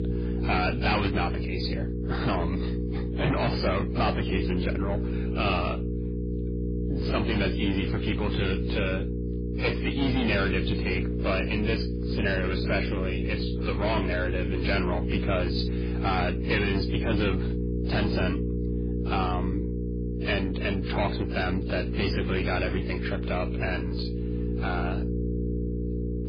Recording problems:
distortion; heavy; 6 dB below the speech
garbled, watery; badly; nothing above 5 kHz
electrical hum; loud; throughout; 60 Hz, 7 dB below the speech

